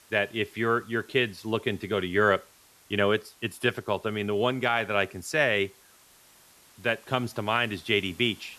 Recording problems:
hiss; faint; throughout; 25 dB below the speech

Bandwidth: 13.5 kHz